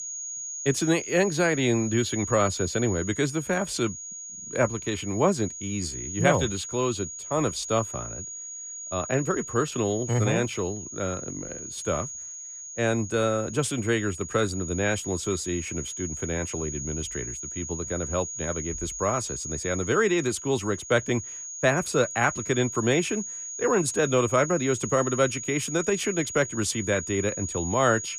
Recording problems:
high-pitched whine; loud; throughout; 6.5 kHz, 7 dB below the speech

